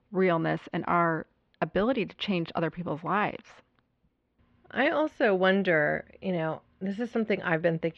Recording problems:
muffled; slightly; fading above 3.5 kHz

